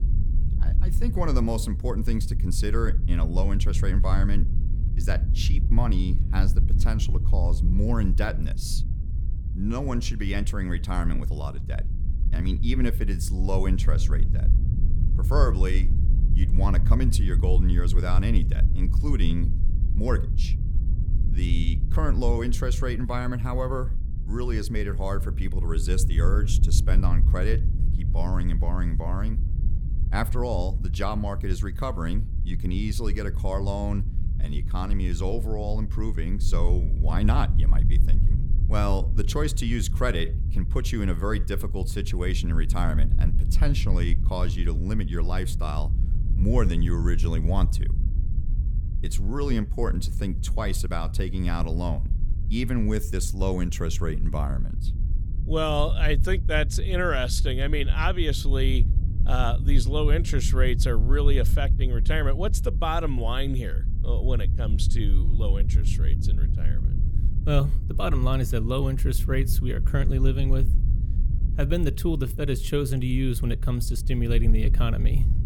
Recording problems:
low rumble; noticeable; throughout; 10 dB below the speech

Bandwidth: 18 kHz